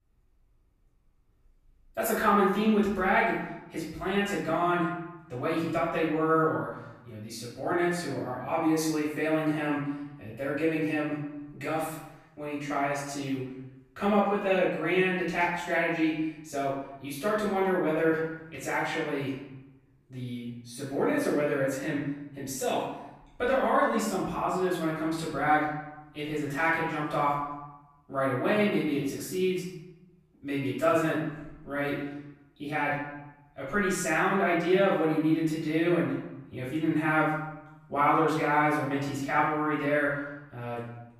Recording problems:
off-mic speech; far
room echo; noticeable; dies away in 0.8 s

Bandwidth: 14.5 kHz